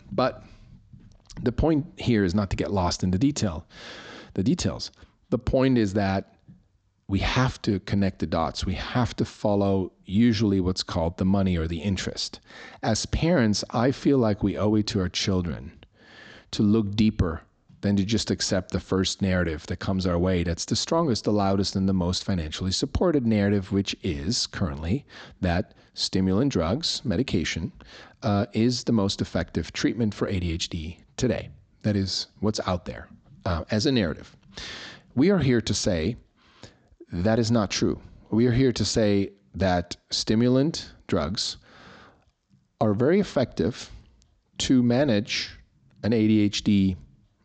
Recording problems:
high frequencies cut off; noticeable; nothing above 8 kHz

